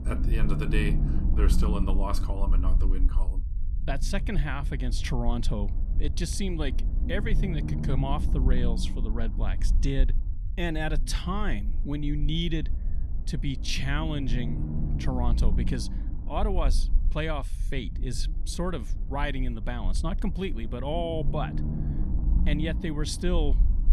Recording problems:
low rumble; noticeable; throughout; 10 dB below the speech

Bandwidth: 13.5 kHz